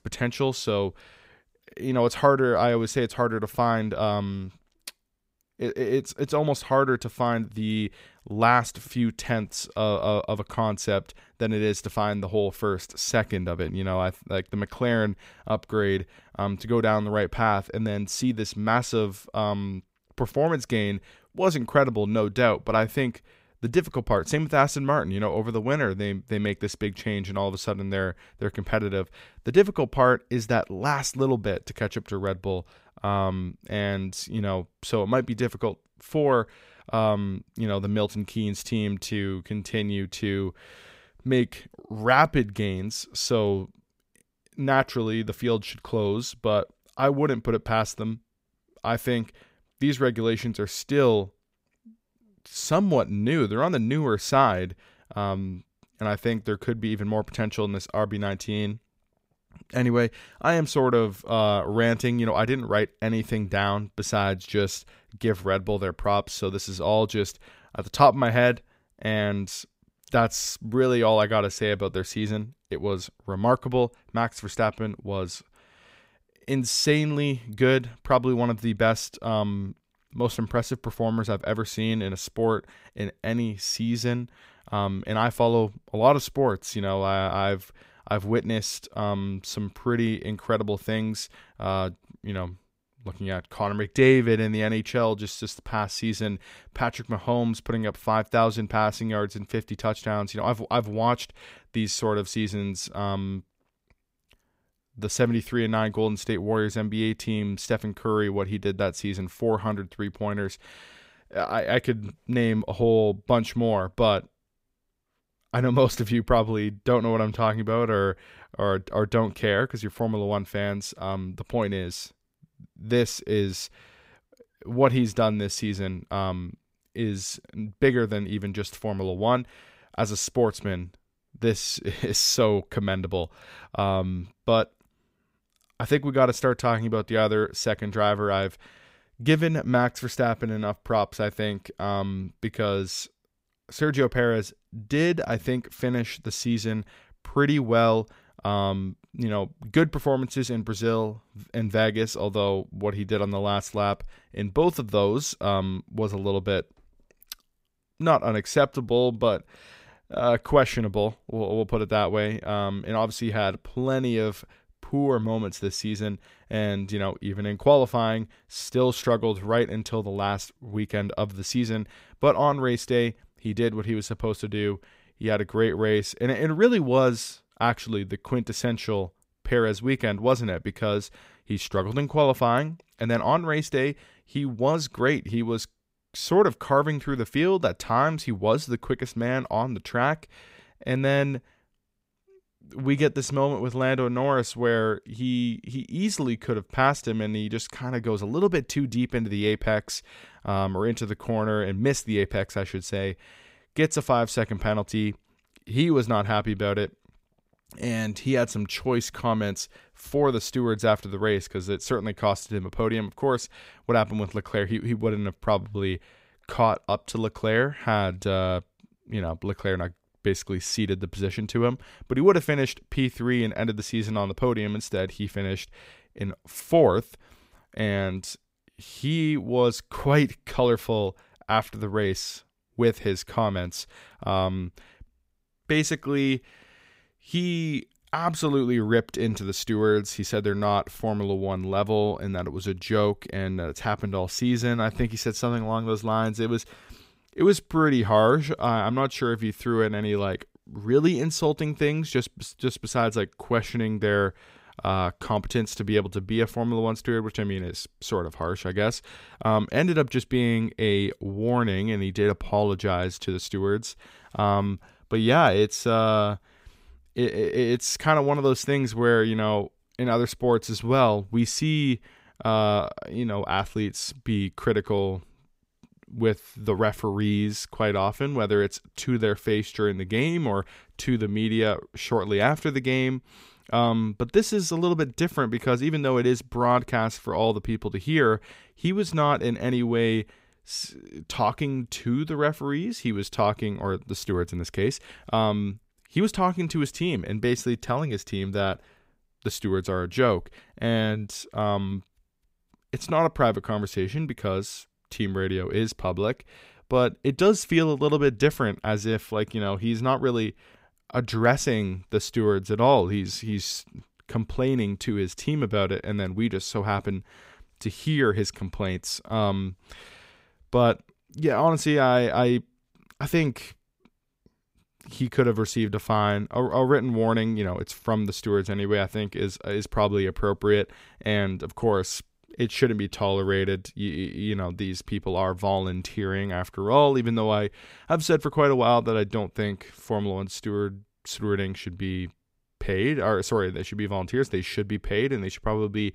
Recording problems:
none

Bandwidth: 15.5 kHz